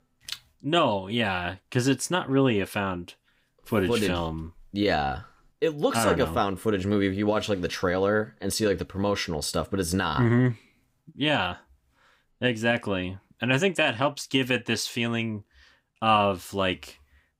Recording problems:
none

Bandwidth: 15.5 kHz